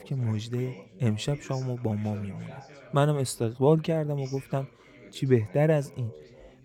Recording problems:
background chatter; faint; throughout; 3 voices, 20 dB below the speech

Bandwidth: 17.5 kHz